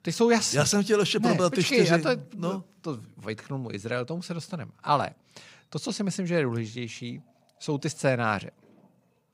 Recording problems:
none

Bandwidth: 15.5 kHz